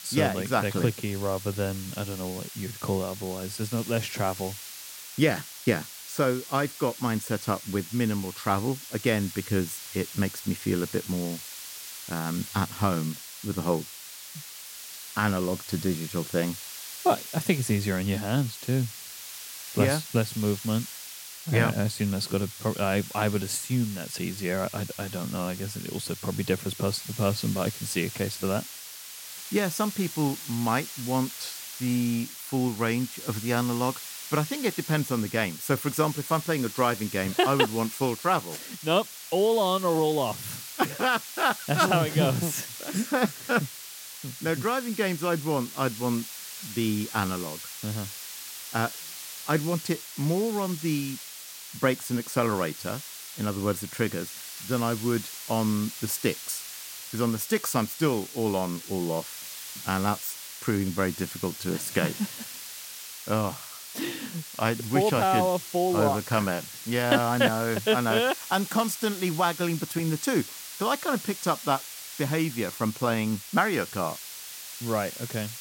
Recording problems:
hiss; loud; throughout; 10 dB below the speech

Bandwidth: 16.5 kHz